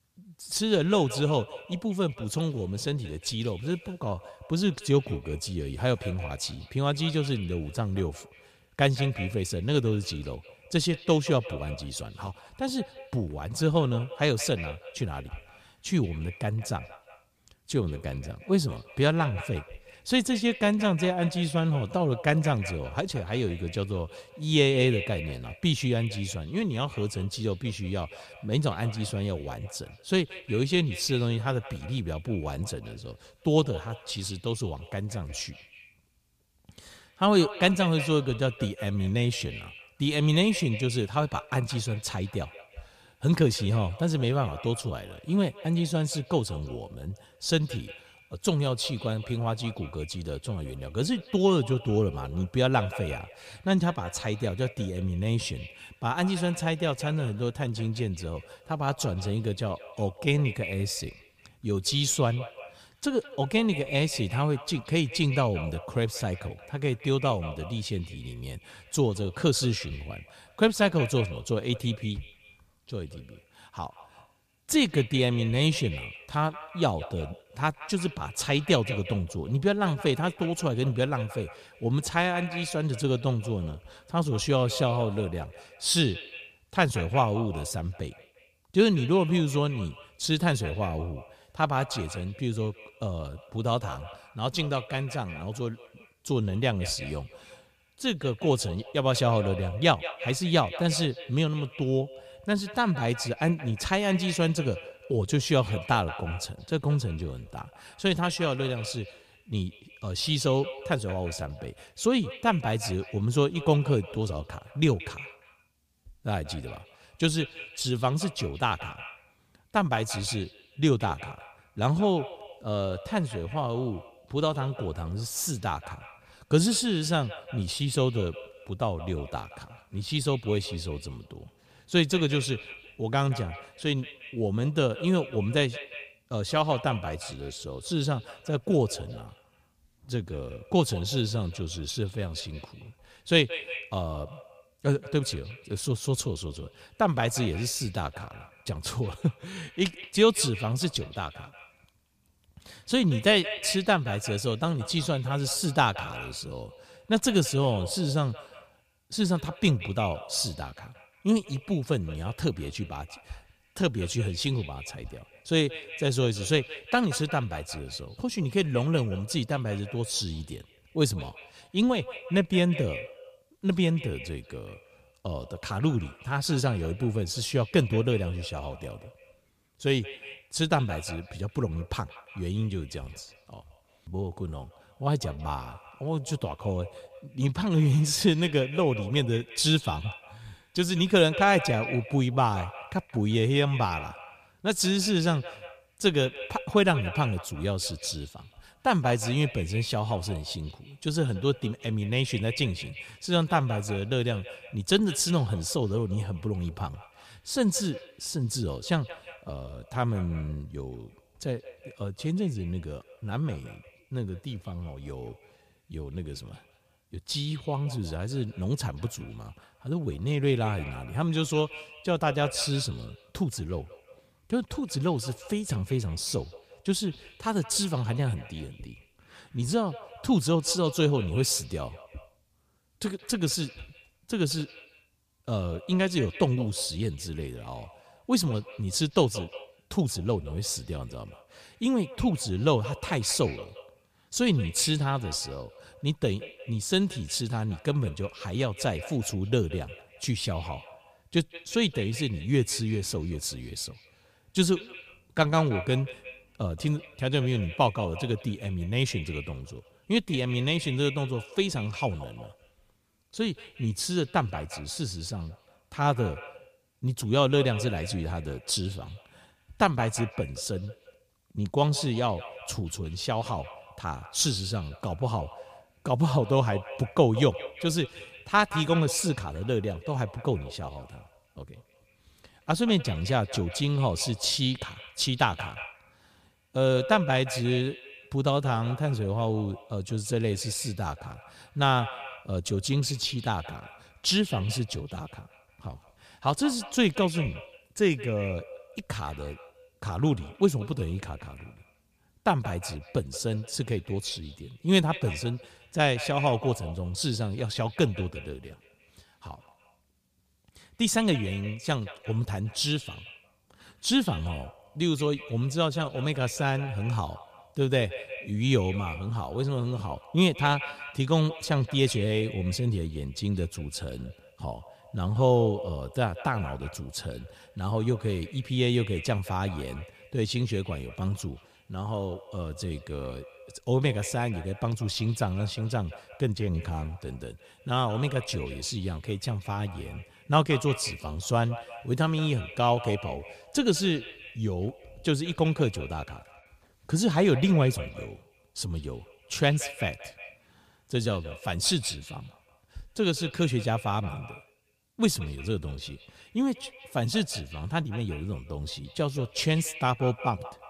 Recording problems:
echo of what is said; noticeable; throughout; 180 ms later, 15 dB below the speech

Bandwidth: 15 kHz